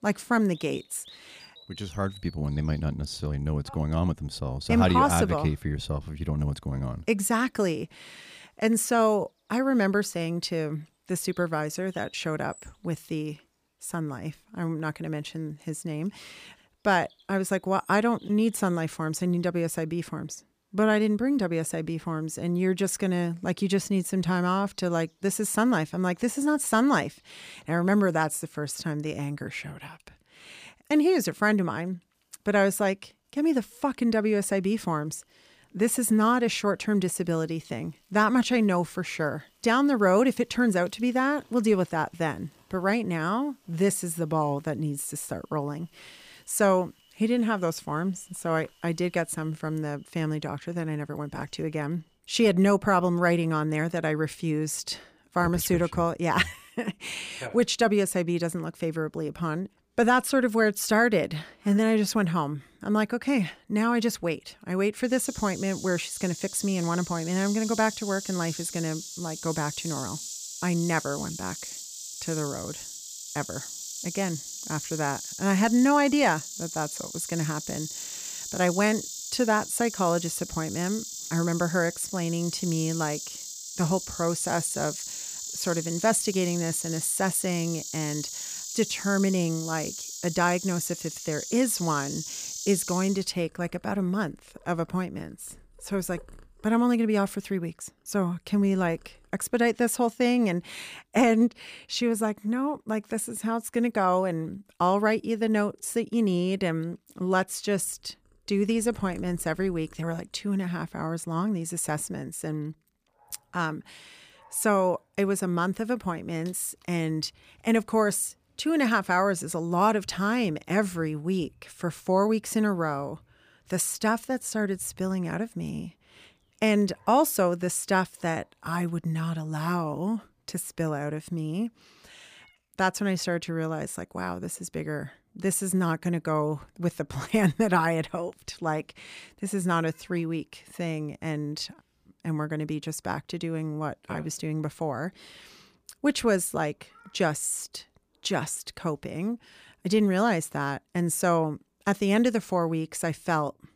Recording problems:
animal sounds; loud; throughout; 9 dB below the speech

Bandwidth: 15 kHz